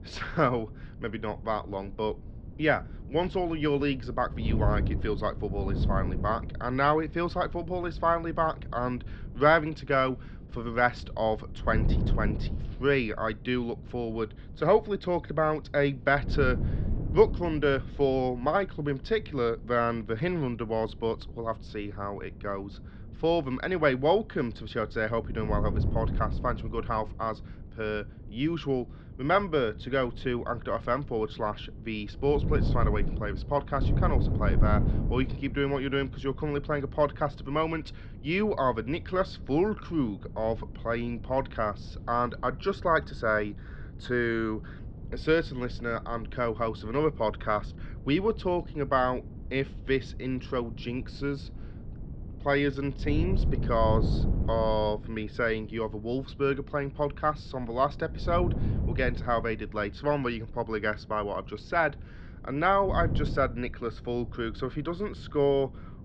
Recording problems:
muffled; slightly; fading above 4 kHz
wind noise on the microphone; occasional gusts; 20 dB below the speech

